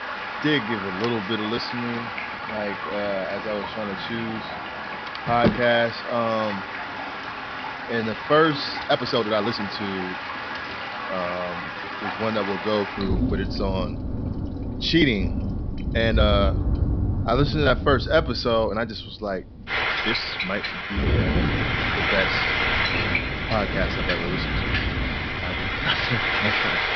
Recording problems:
high frequencies cut off; noticeable; nothing above 5.5 kHz
household noises; very loud; throughout; as loud as the speech
rain or running water; loud; throughout; 4 dB below the speech
uneven, jittery; strongly; from 2.5 to 26 s

